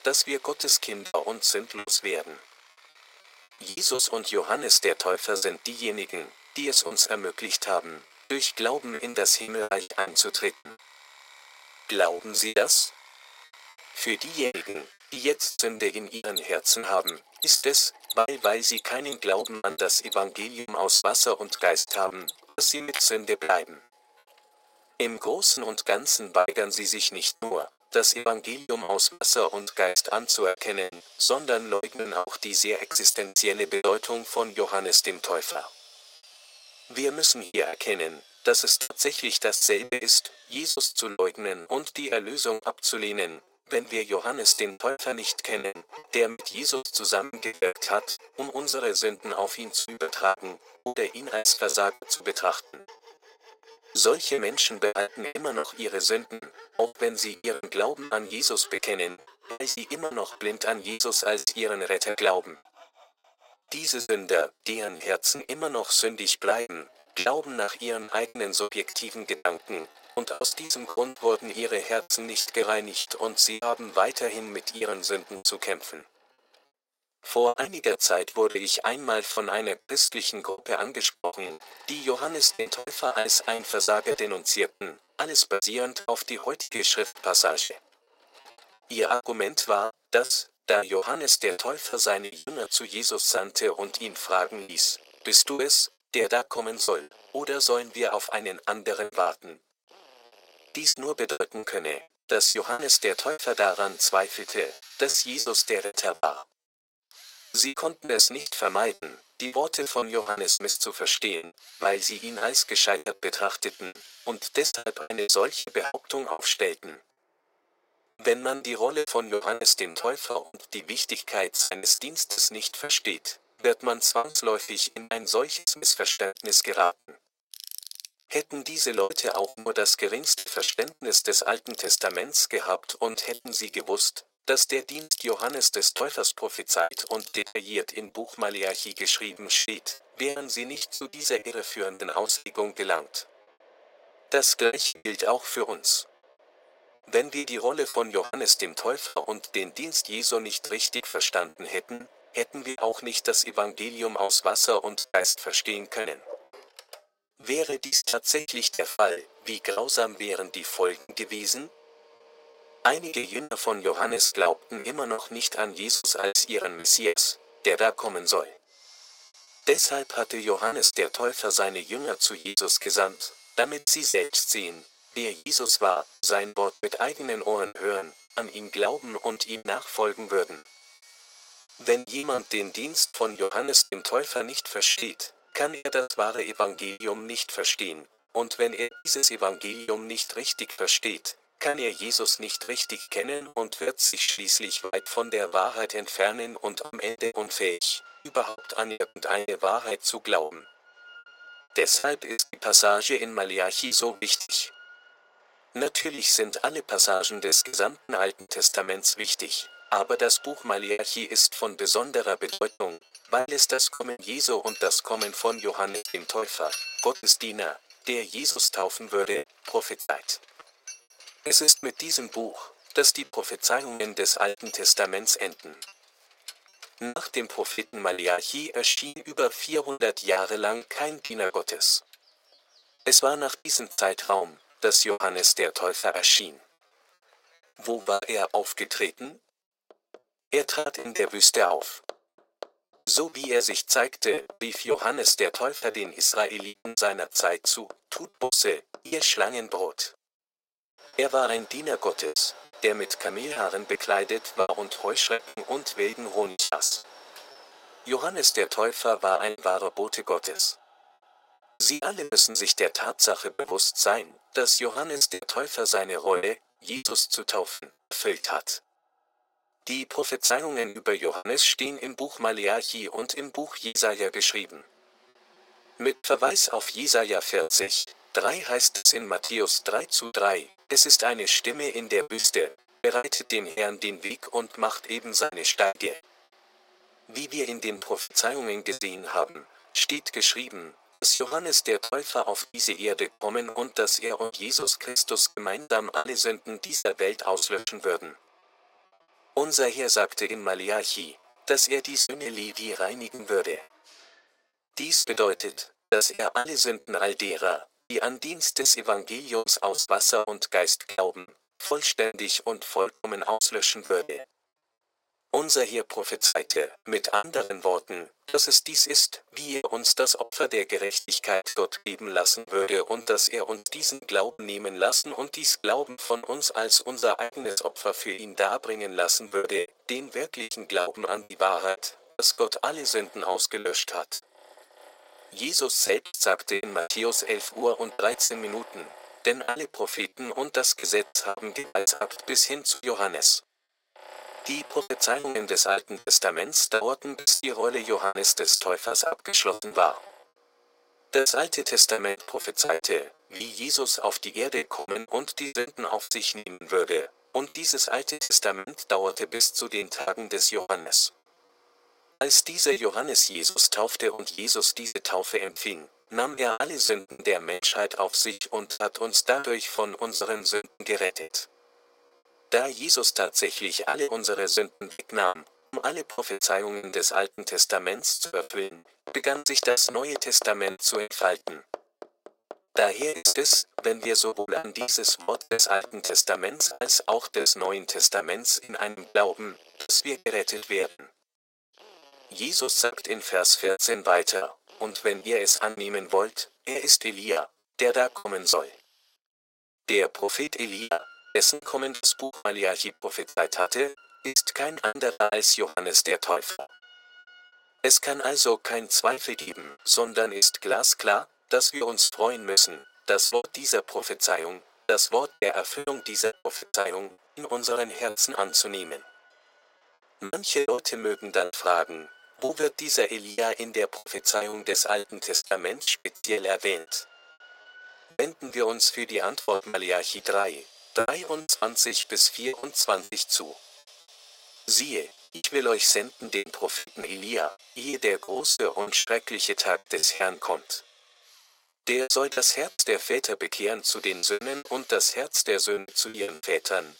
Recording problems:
thin; very; fading below 500 Hz
machinery noise; faint; throughout; 20 dB below the speech
choppy; very; 14% of the speech affected

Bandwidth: 16 kHz